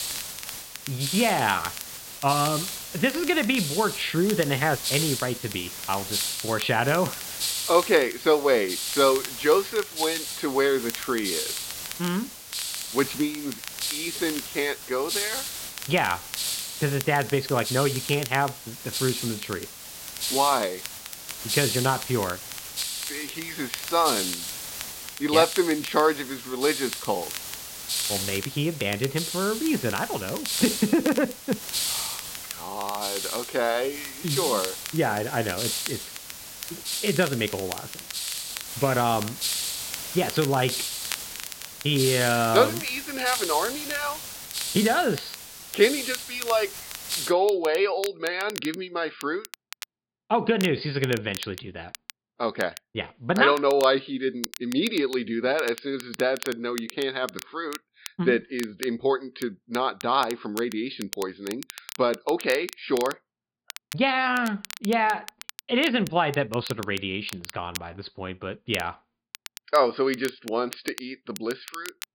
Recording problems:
high frequencies cut off; severe; nothing above 5 kHz
hiss; loud; until 47 s; 5 dB below the speech
crackle, like an old record; noticeable; 15 dB below the speech

